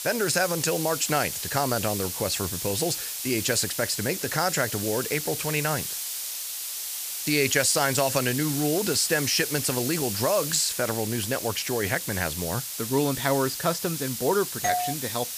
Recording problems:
hiss; loud; throughout; 4 dB below the speech
doorbell; noticeable; at 15 s; peak 1 dB below the speech

